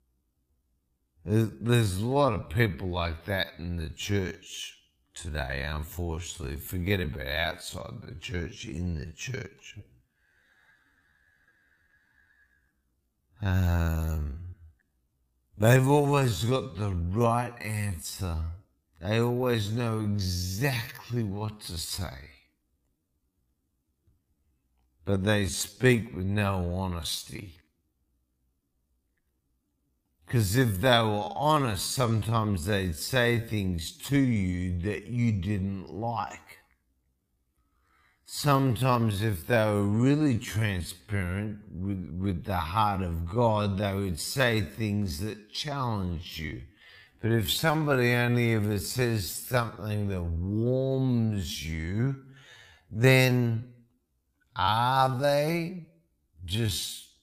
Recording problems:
wrong speed, natural pitch; too slow; 0.5 times normal speed

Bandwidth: 15 kHz